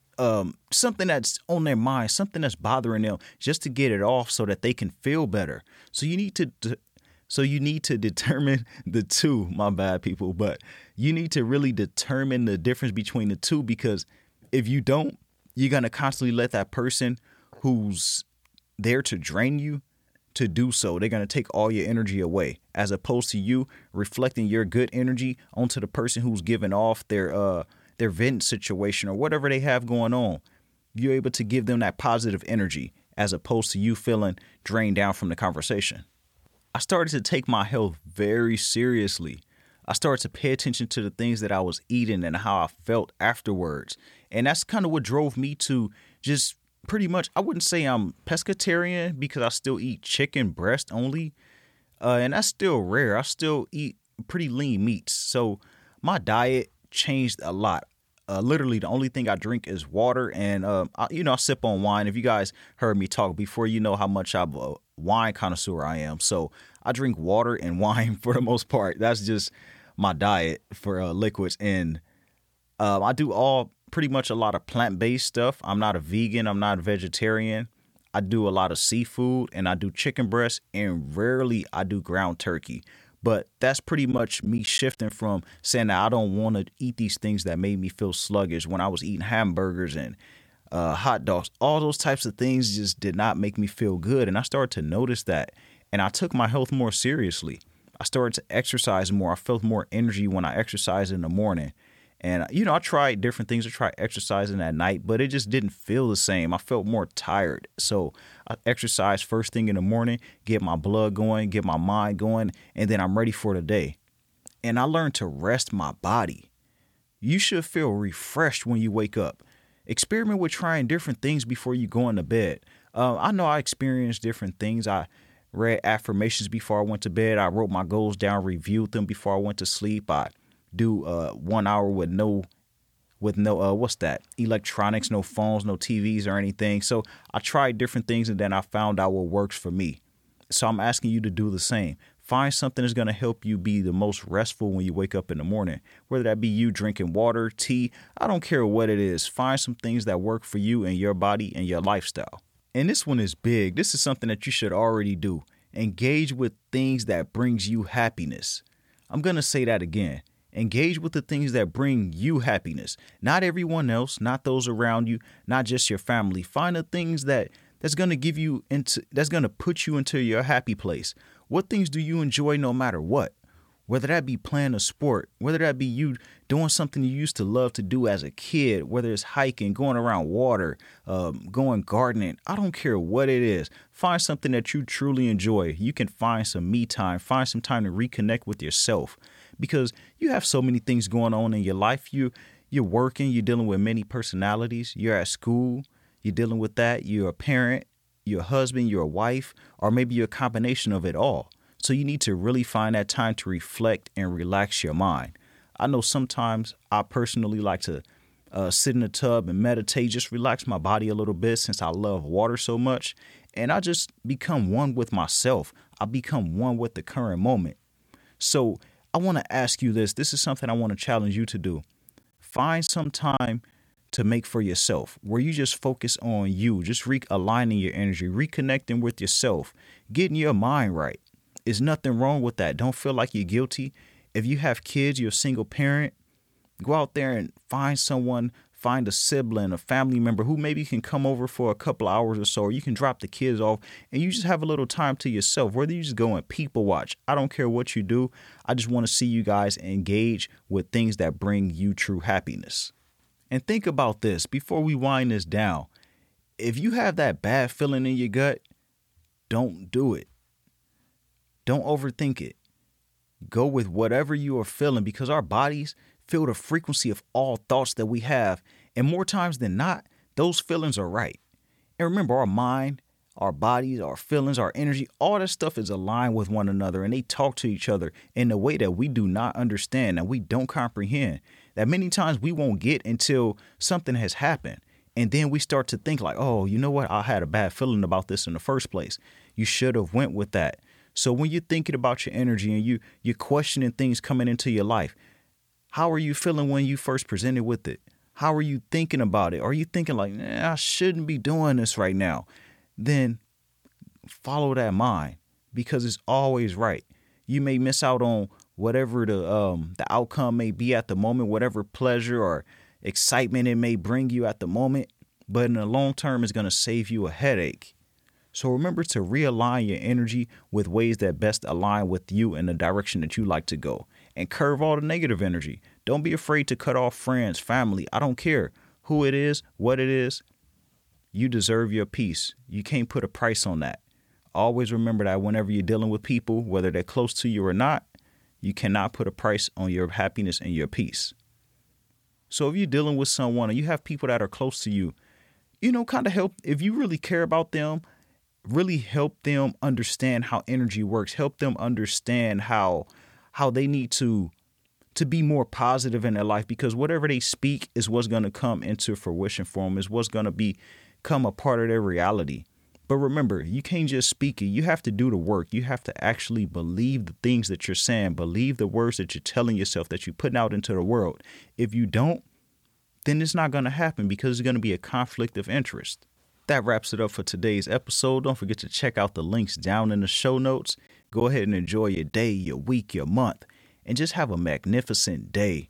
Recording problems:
choppy; very; at 1:24, from 3:43 to 3:44 and from 6:21 to 6:23; 6% of the speech affected

